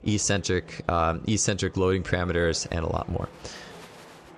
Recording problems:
murmuring crowd; faint; throughout; 20 dB below the speech

